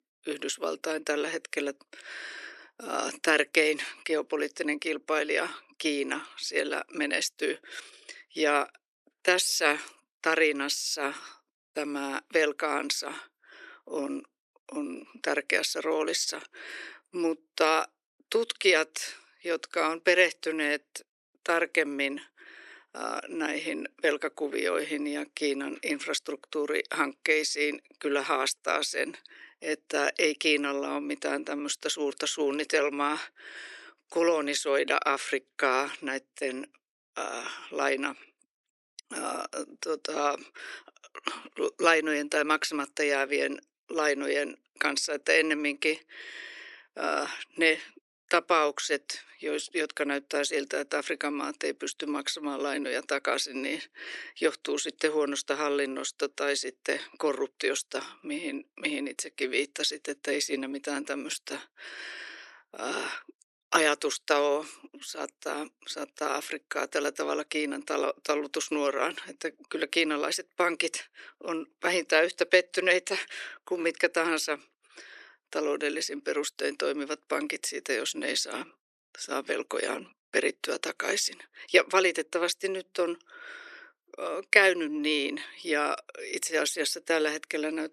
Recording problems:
thin; somewhat; fading below 400 Hz

